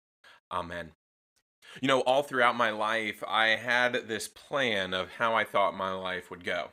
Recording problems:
uneven, jittery; strongly; from 1.5 to 6 s

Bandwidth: 15.5 kHz